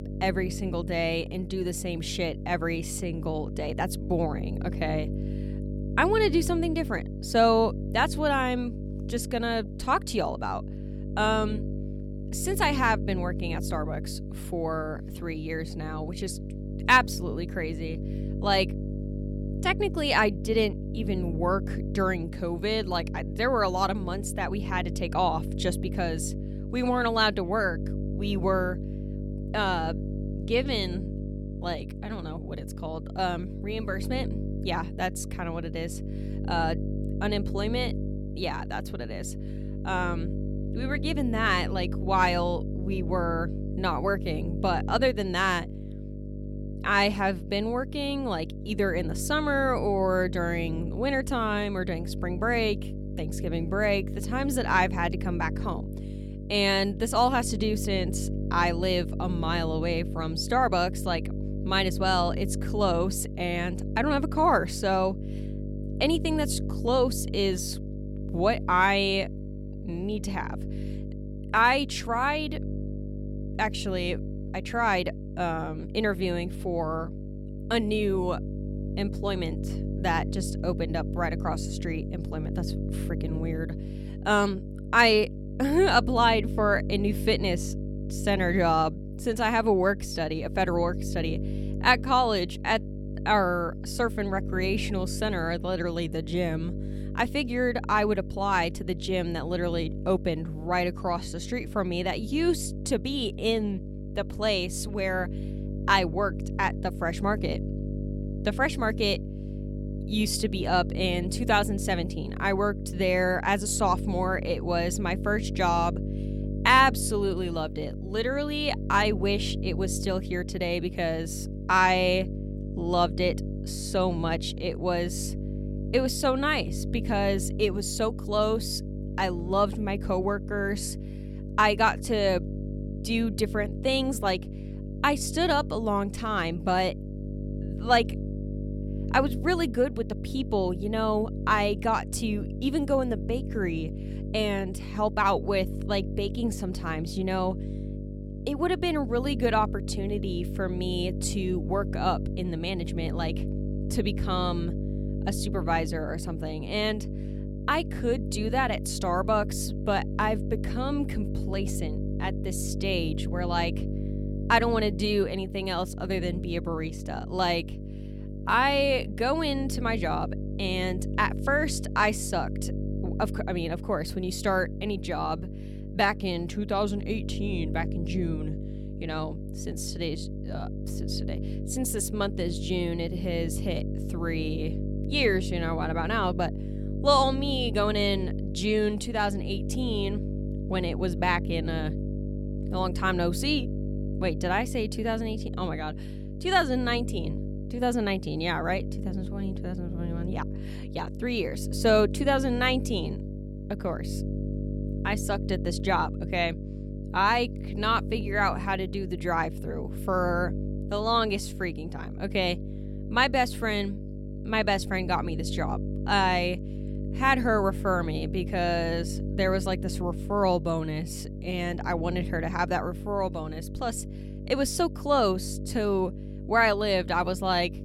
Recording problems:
electrical hum; noticeable; throughout; 50 Hz, 15 dB below the speech

